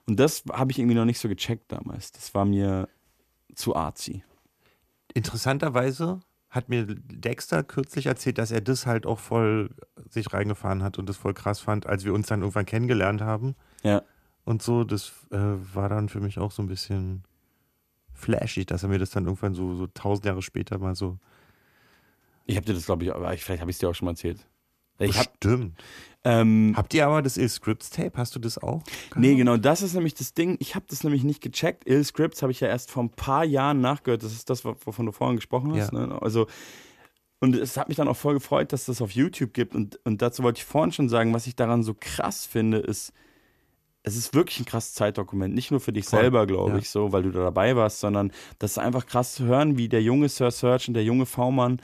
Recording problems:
none

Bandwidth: 14 kHz